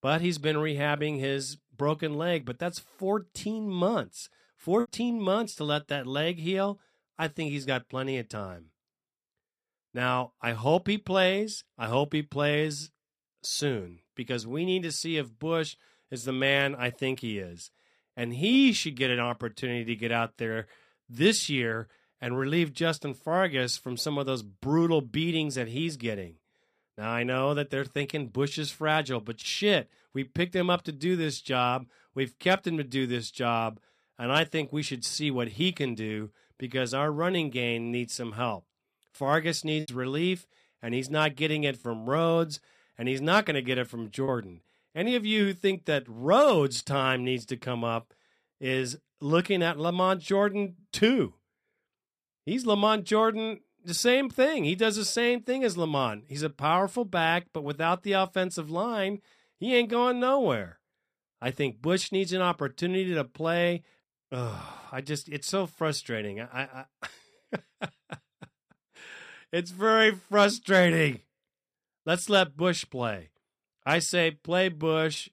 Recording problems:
choppy; occasionally; at 5 s and from 40 to 44 s; 4% of the speech affected

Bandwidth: 14.5 kHz